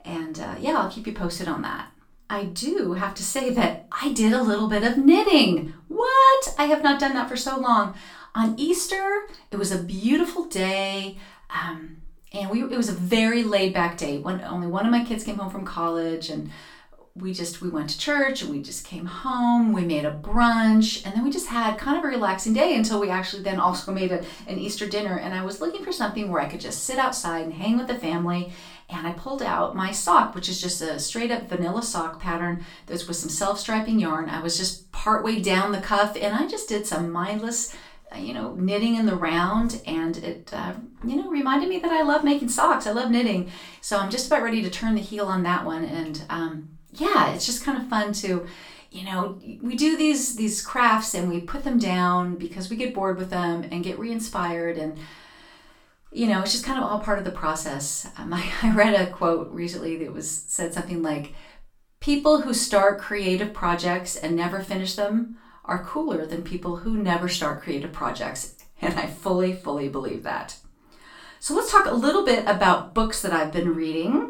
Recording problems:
off-mic speech; far
room echo; slight; dies away in 0.3 s

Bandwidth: 18 kHz